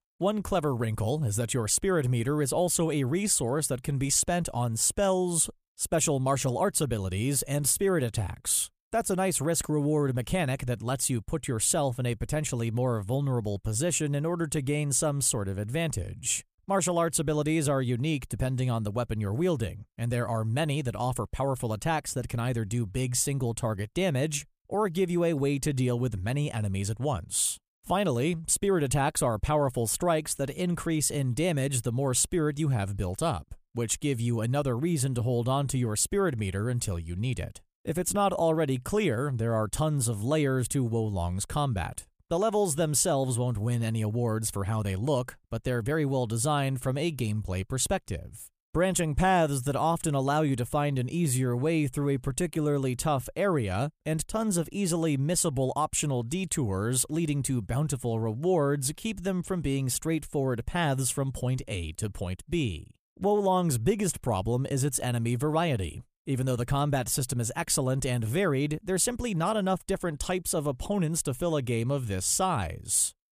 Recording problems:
none

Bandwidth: 15 kHz